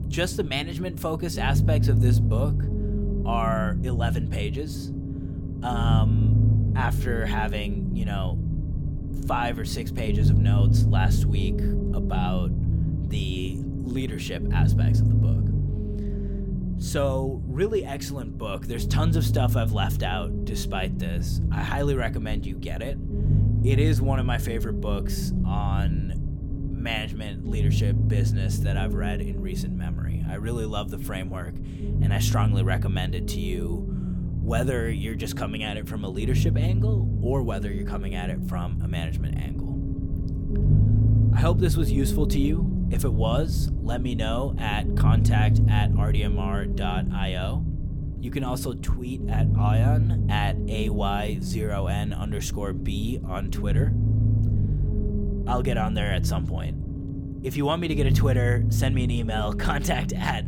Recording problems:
low rumble; loud; throughout; 6 dB below the speech

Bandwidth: 17 kHz